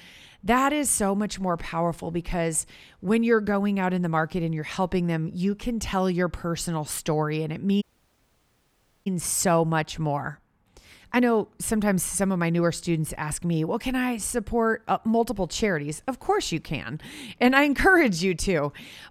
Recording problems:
audio cutting out; at 8 s for 1 s

